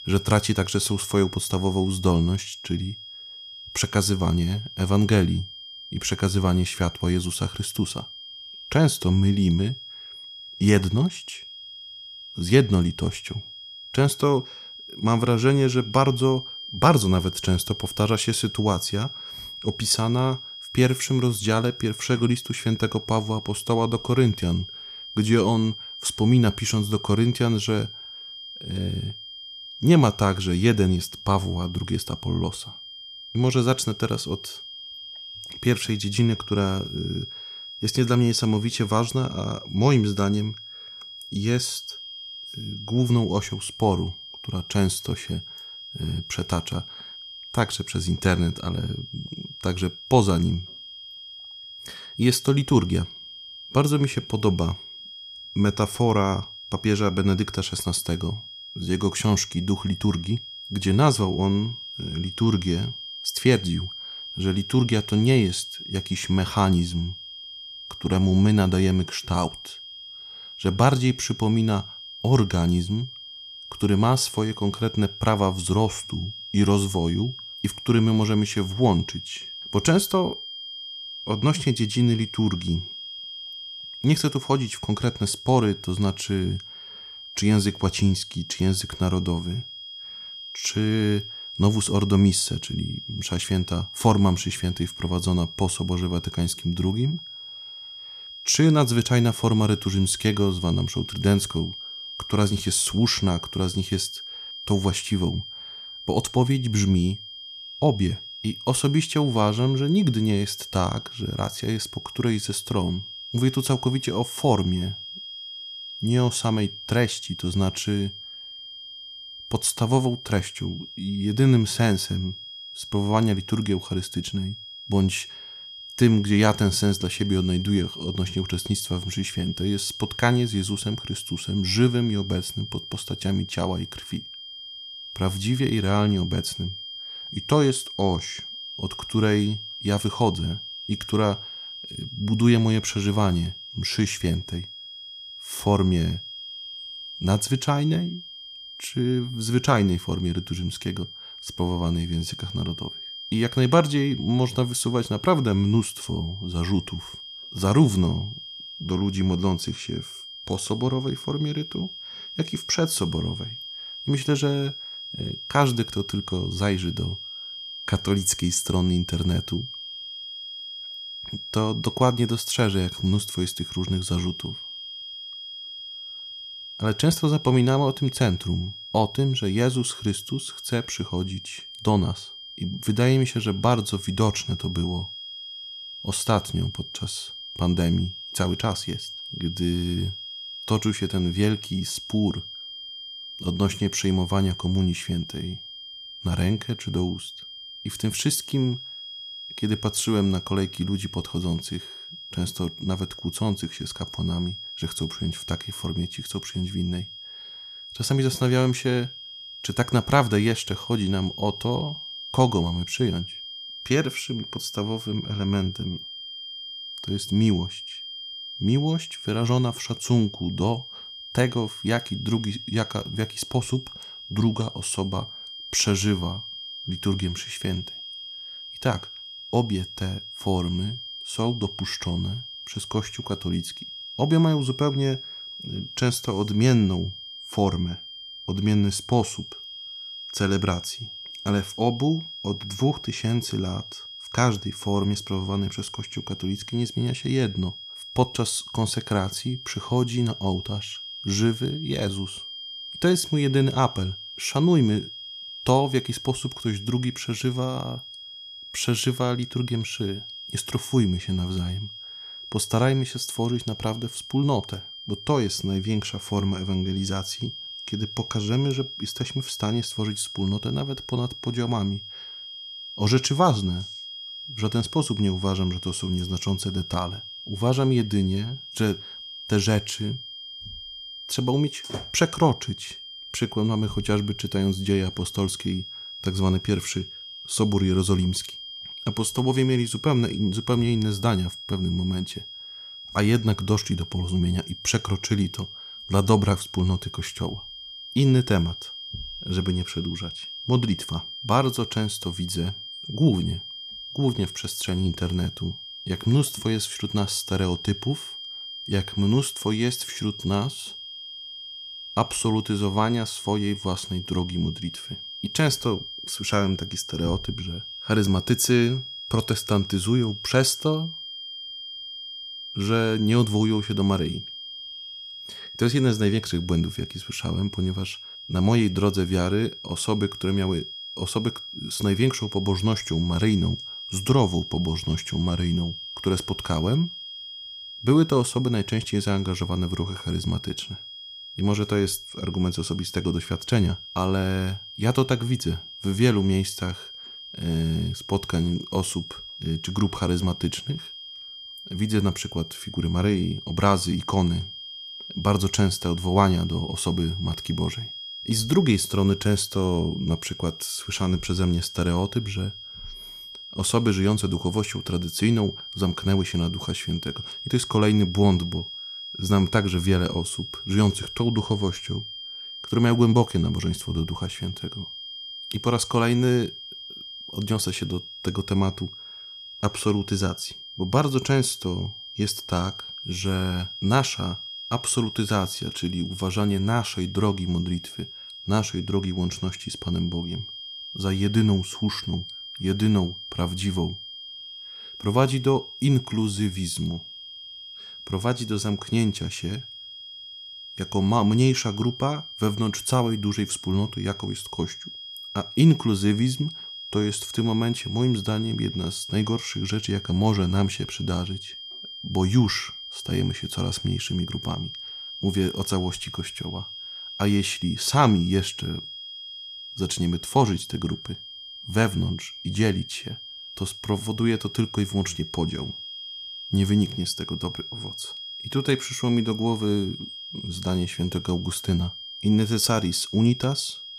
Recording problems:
high-pitched whine; noticeable; throughout; 3 kHz, 10 dB below the speech

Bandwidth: 14.5 kHz